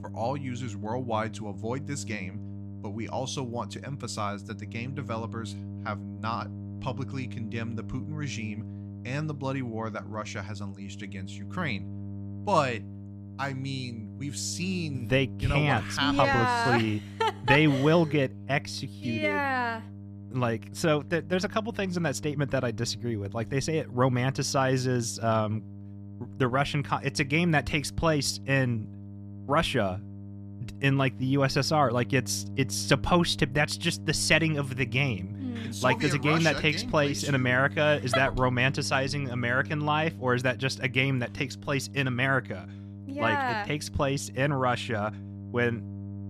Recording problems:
electrical hum; faint; throughout; 50 Hz, 20 dB below the speech

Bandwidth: 14.5 kHz